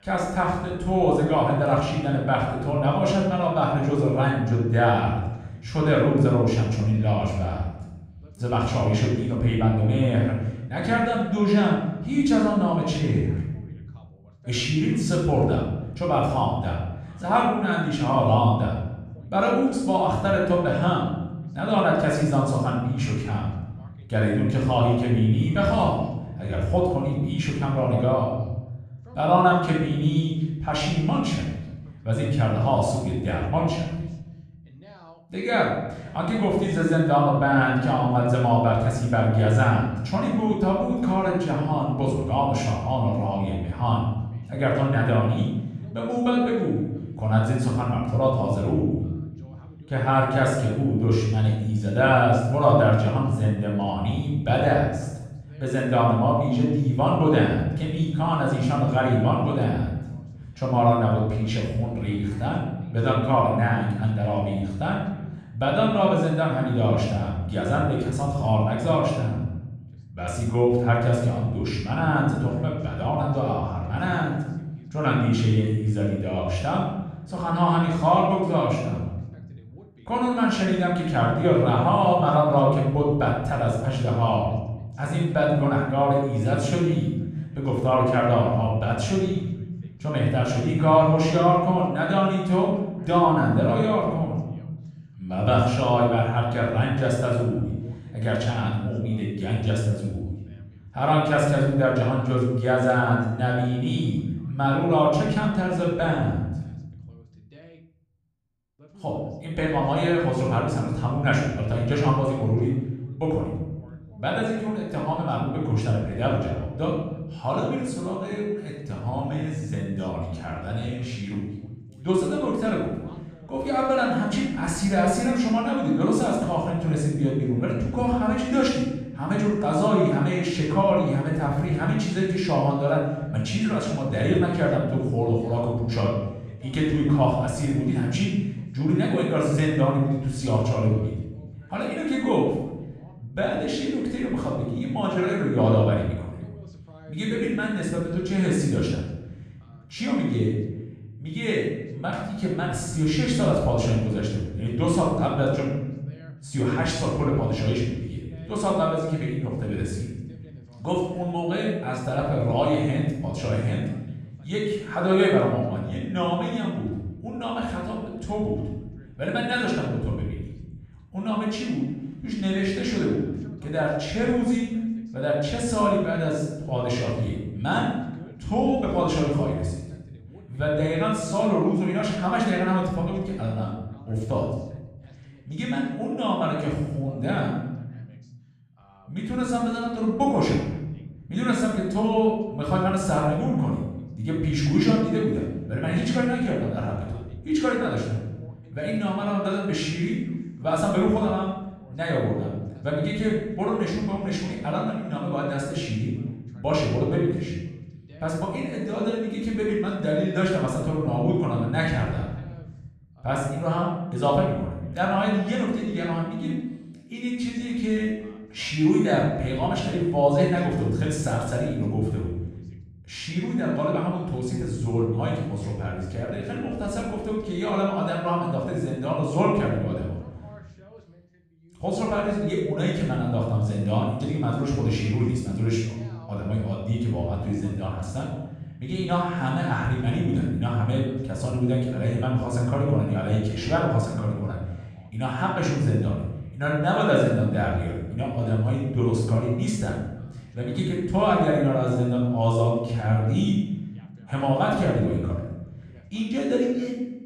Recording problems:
off-mic speech; far
room echo; noticeable; dies away in 1.1 s
voice in the background; faint; throughout; 30 dB below the speech

